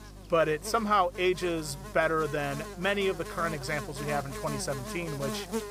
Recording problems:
electrical hum; noticeable; throughout; 50 Hz, 10 dB below the speech

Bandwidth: 15.5 kHz